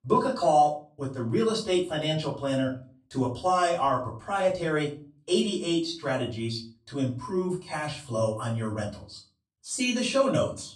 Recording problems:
off-mic speech; far
room echo; slight; dies away in 0.3 s

